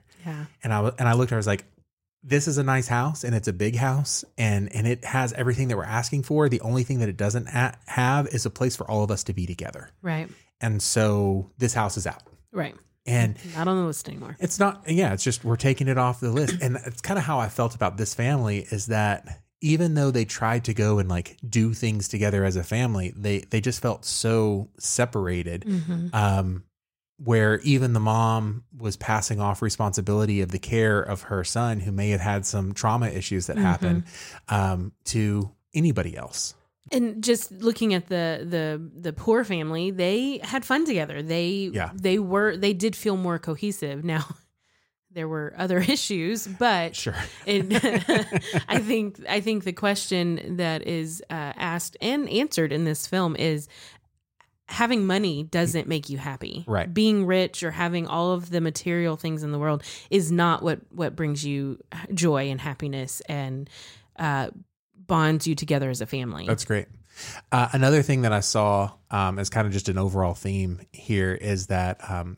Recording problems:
none

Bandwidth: 16 kHz